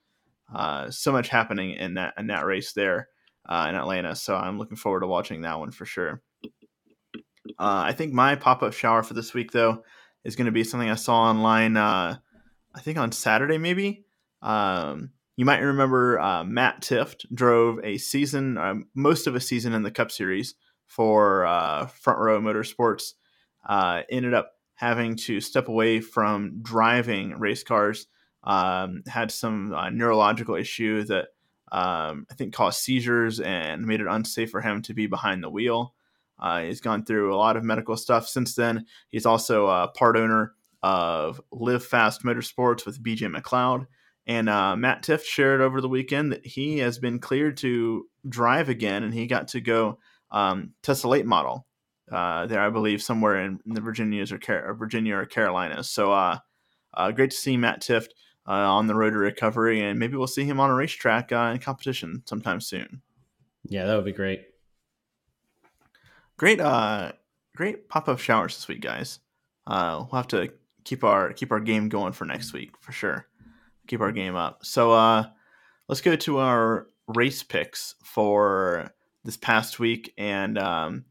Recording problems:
none

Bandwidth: 17 kHz